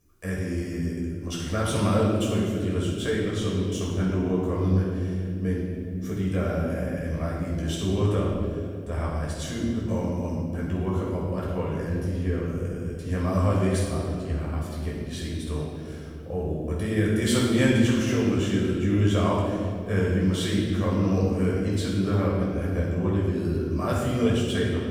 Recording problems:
room echo; strong; dies away in 2.1 s
off-mic speech; far

